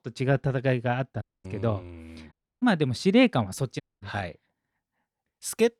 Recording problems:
audio cutting out; at 1 s, at 2.5 s and at 4 s

